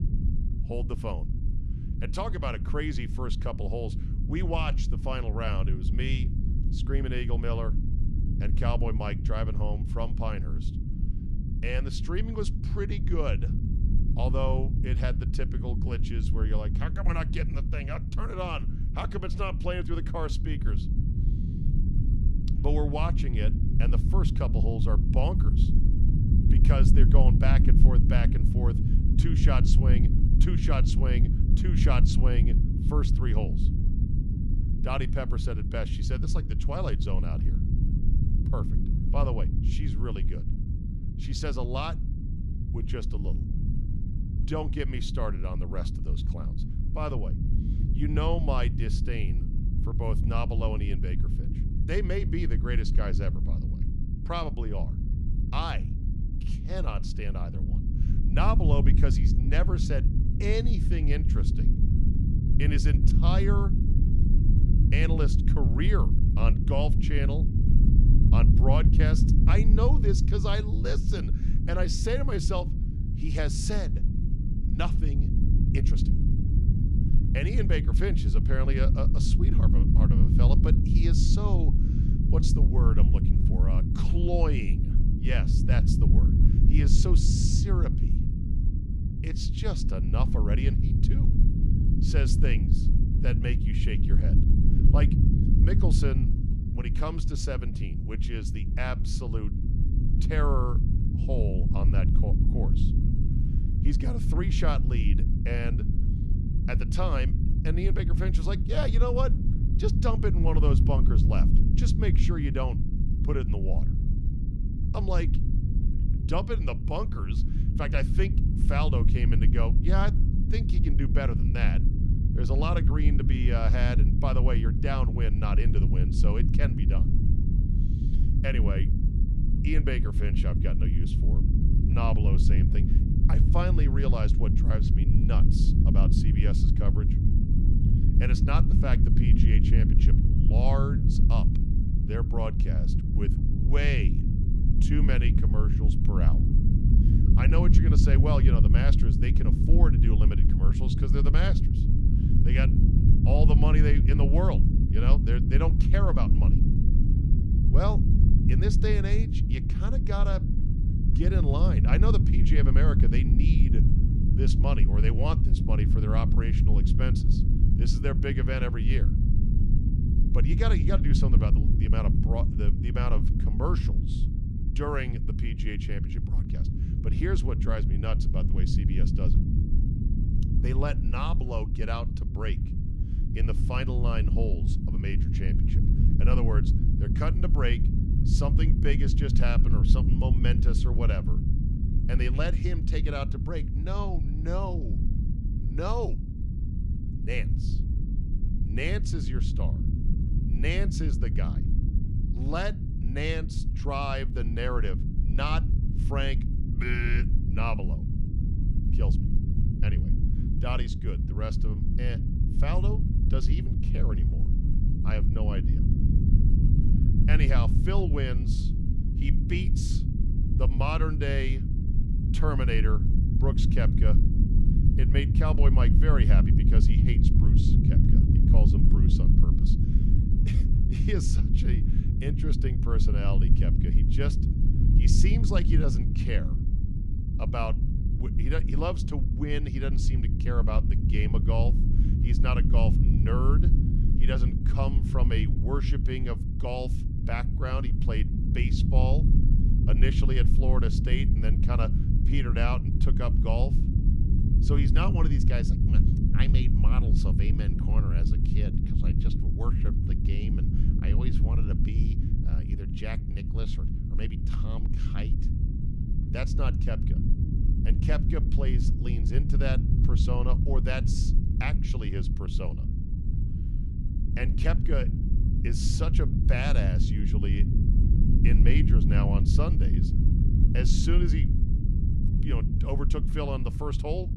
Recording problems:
low rumble; loud; throughout; 4 dB below the speech

